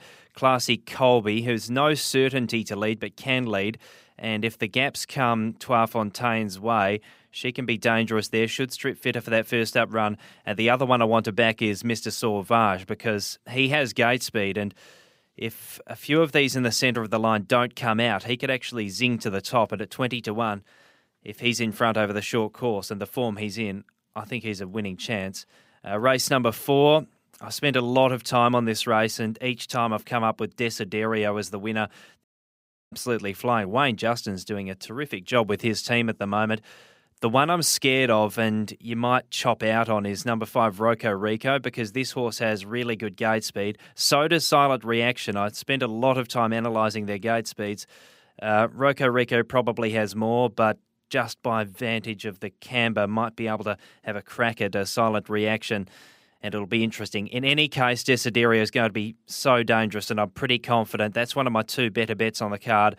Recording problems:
audio cutting out; at 32 s for 0.5 s

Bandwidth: 15.5 kHz